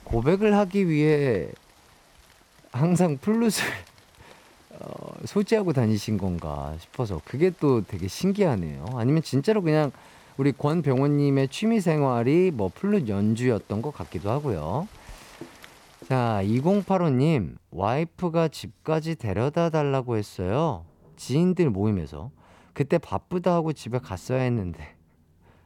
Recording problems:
rain or running water; faint; throughout; 25 dB below the speech

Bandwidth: 18 kHz